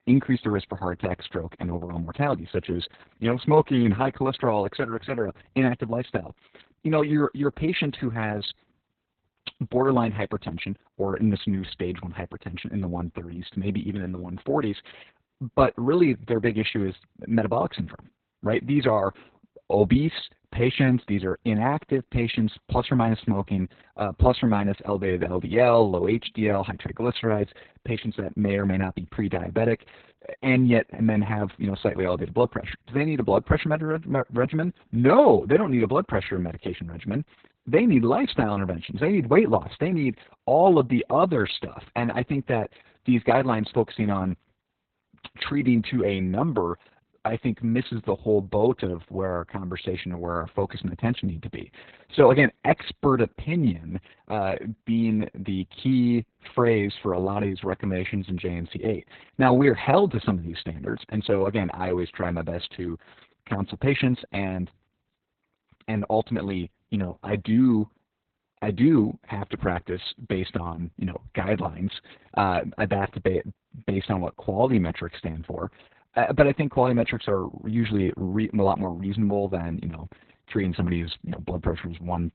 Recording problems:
garbled, watery; badly; nothing above 4 kHz

